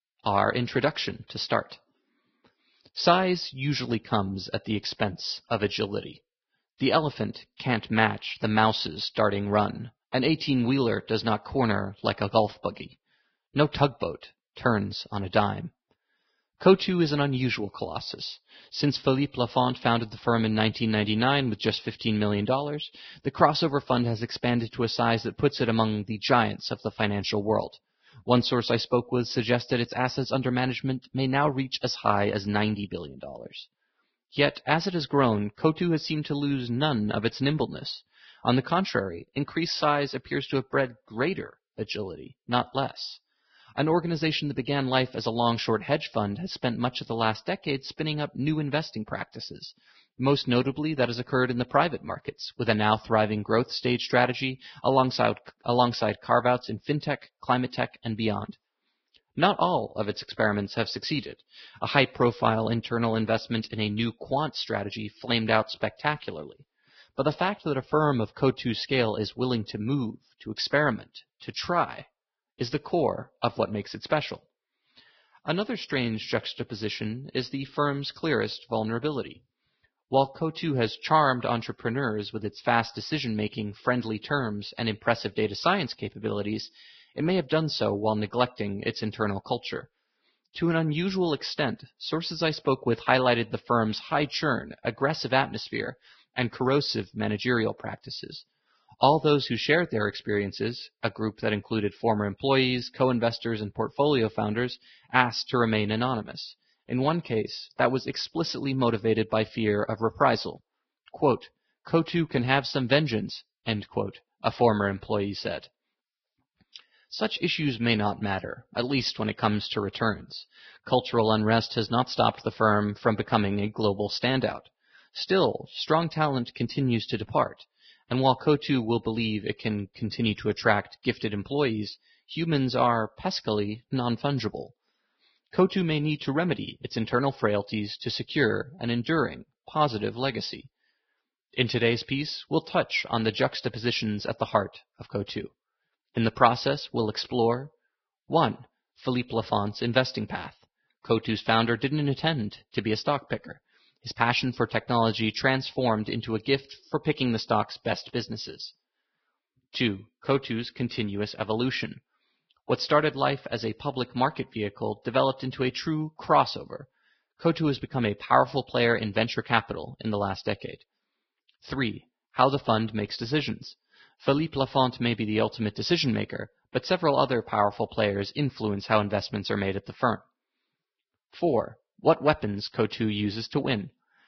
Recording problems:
garbled, watery; badly; nothing above 5.5 kHz

